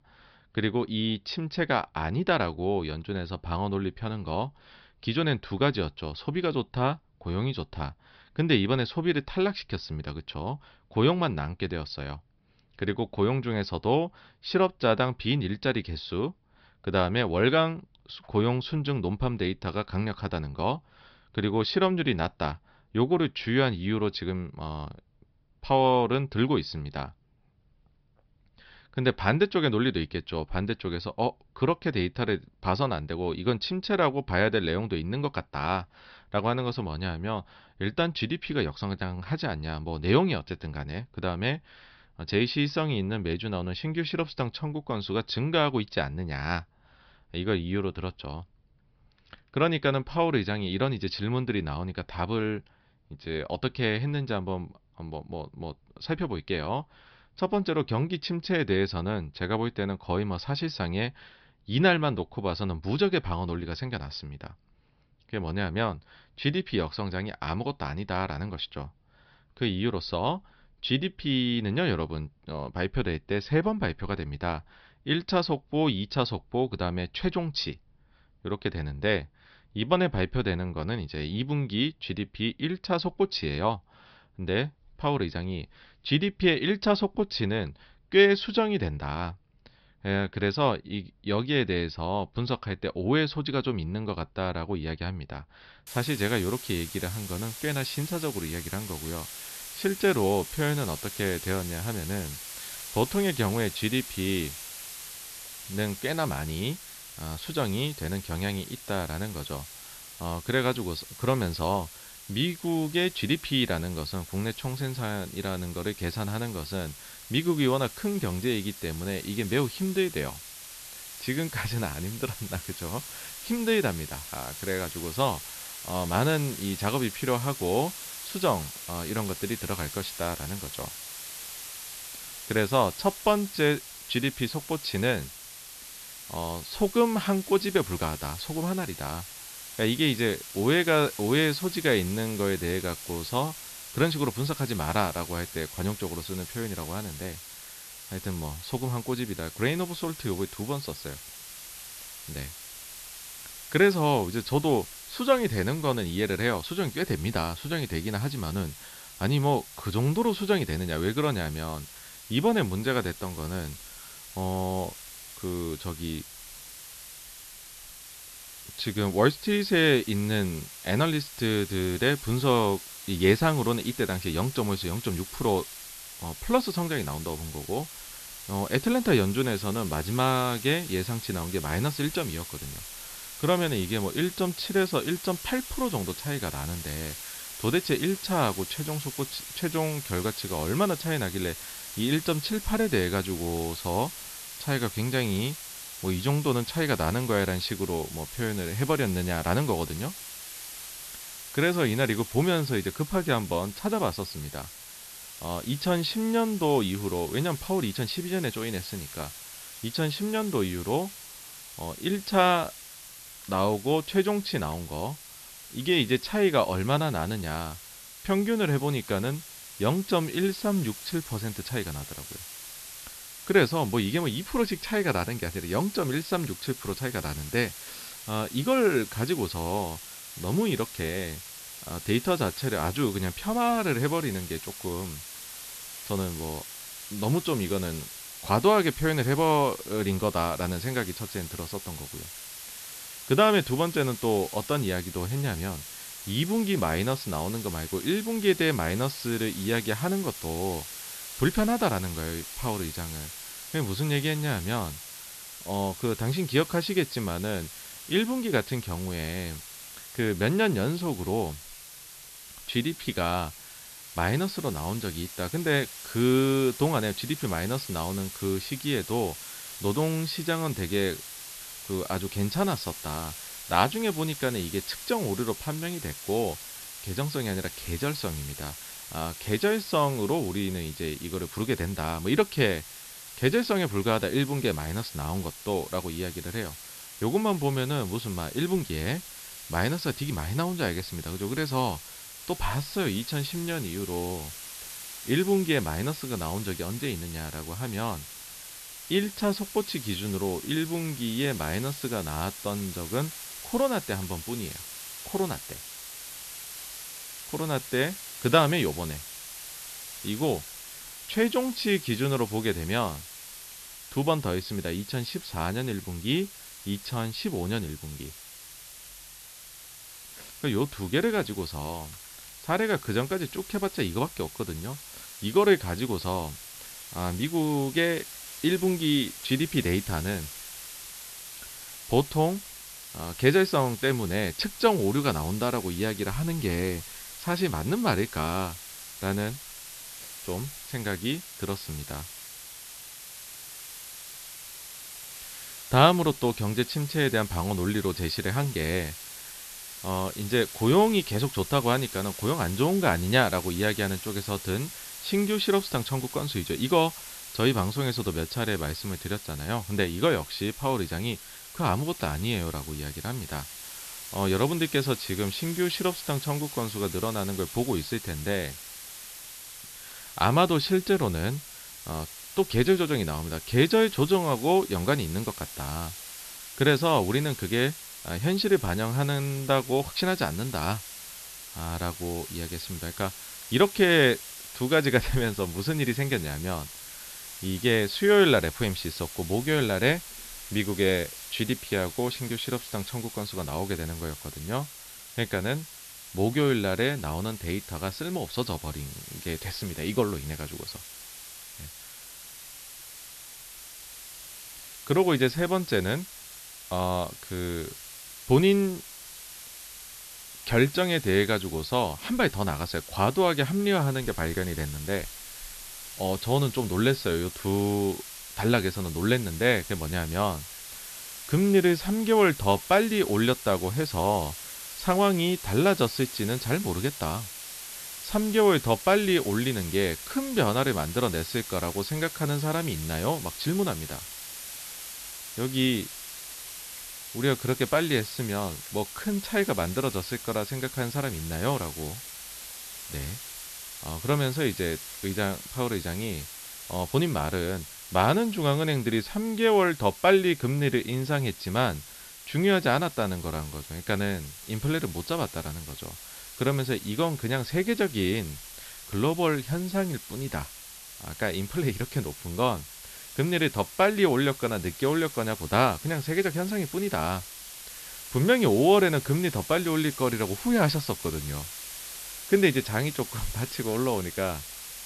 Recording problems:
high frequencies cut off; noticeable; nothing above 5.5 kHz
hiss; noticeable; from 1:36 on; 10 dB below the speech

